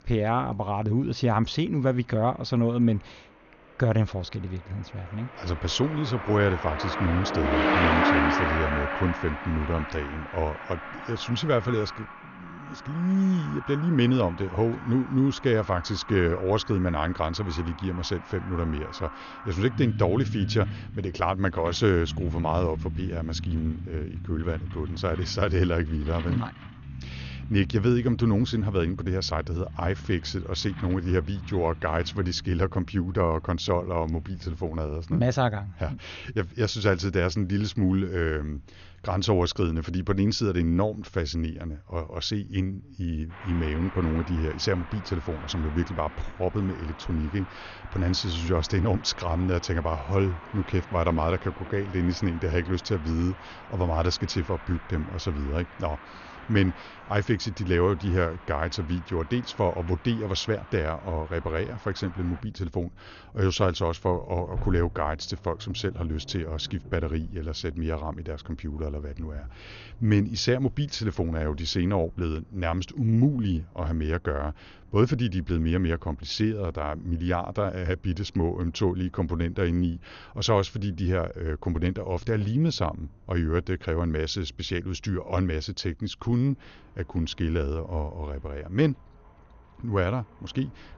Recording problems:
garbled, watery; slightly; nothing above 6.5 kHz
traffic noise; loud; throughout; 8 dB below the speech

